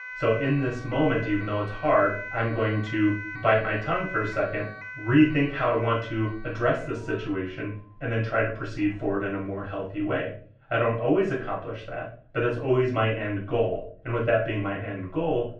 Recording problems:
off-mic speech; far
muffled; very; fading above 2.5 kHz
room echo; slight; dies away in 0.4 s
alarms or sirens; noticeable; throughout; 10 dB below the speech

